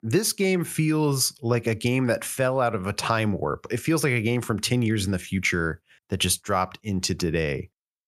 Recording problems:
none

